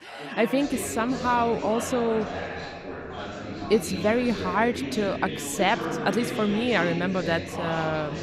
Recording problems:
background chatter; loud; throughout; 3 voices, 7 dB below the speech

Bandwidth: 15.5 kHz